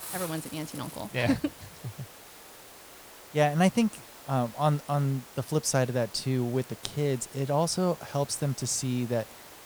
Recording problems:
hiss; noticeable; throughout; 15 dB below the speech

